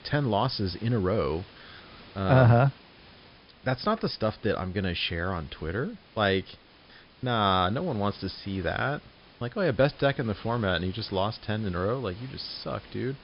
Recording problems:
high frequencies cut off; noticeable; nothing above 5.5 kHz
hiss; faint; throughout; 25 dB below the speech

